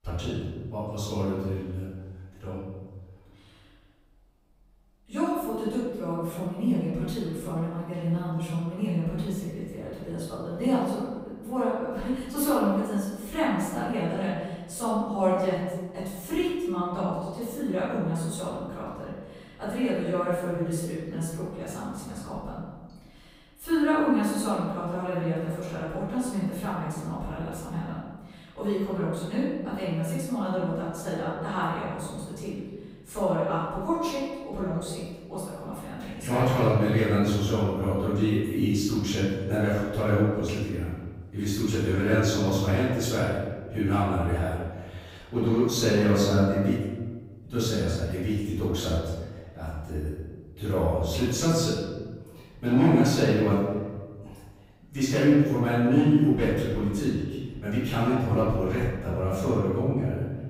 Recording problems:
room echo; strong; dies away in 1.3 s
off-mic speech; far

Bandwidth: 15.5 kHz